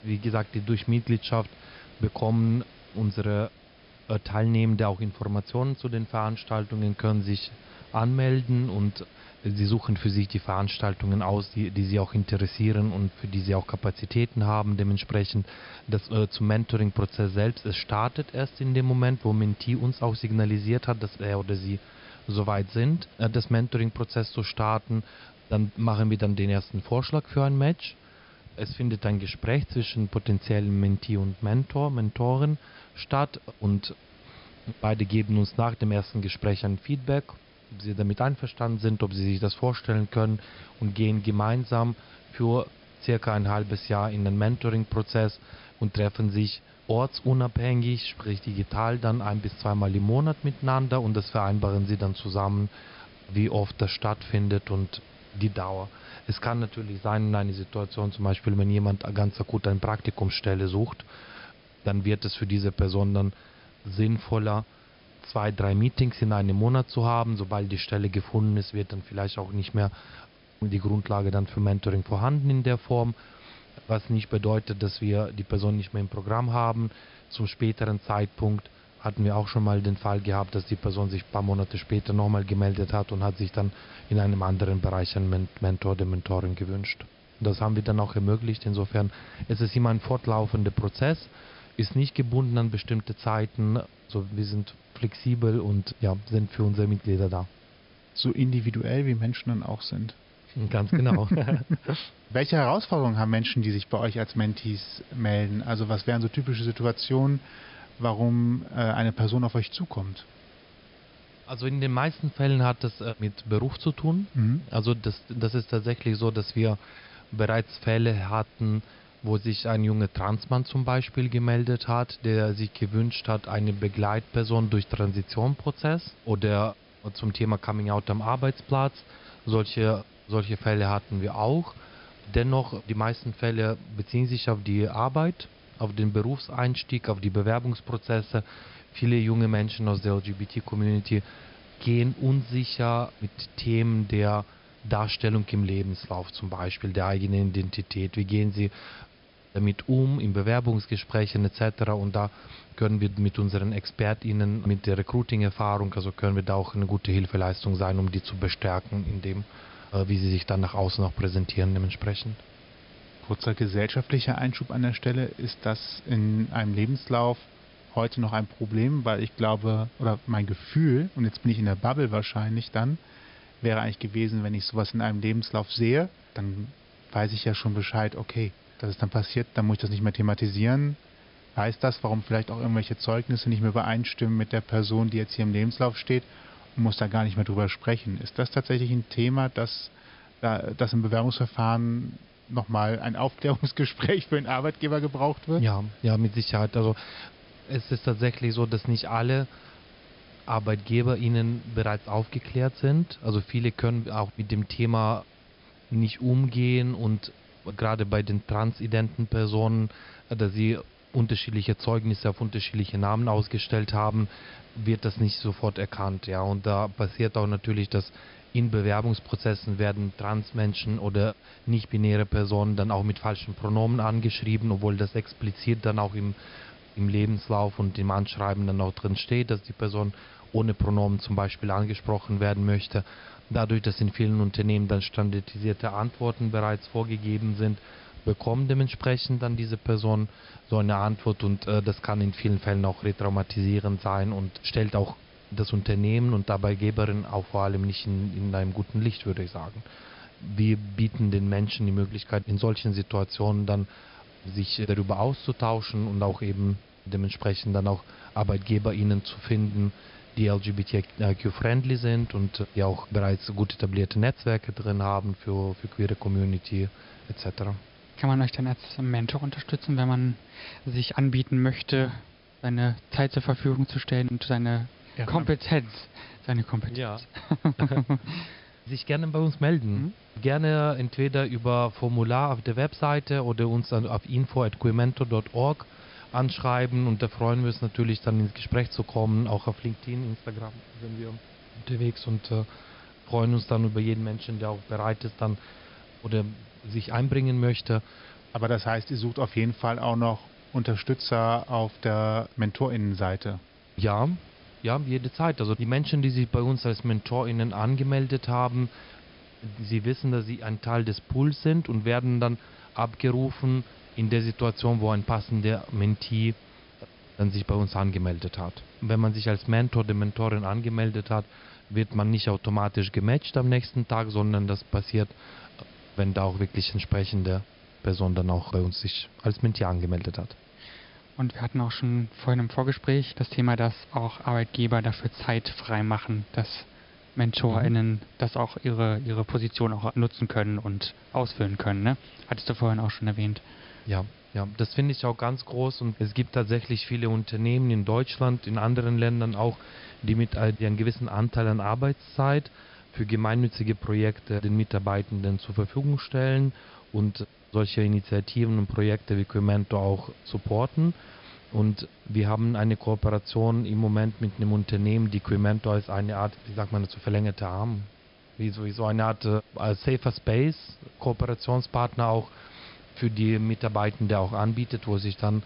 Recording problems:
high frequencies cut off; noticeable; nothing above 5.5 kHz
hiss; faint; throughout; 25 dB below the speech

